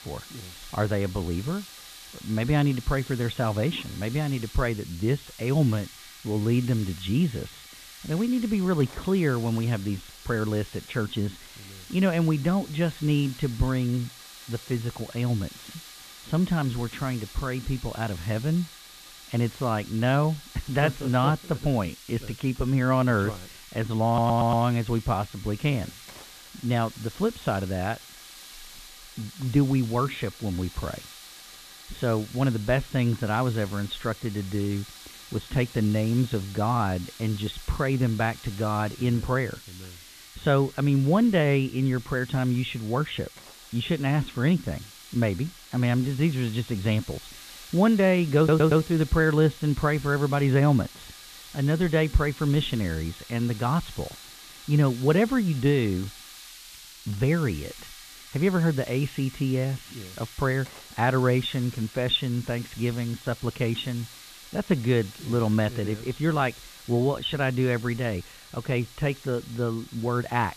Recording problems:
high frequencies cut off; severe; nothing above 4 kHz
hiss; noticeable; throughout; 15 dB below the speech
audio stuttering; at 24 s and at 48 s

